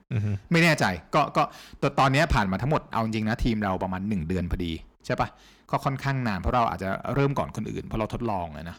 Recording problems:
distortion; slight; 10 dB below the speech

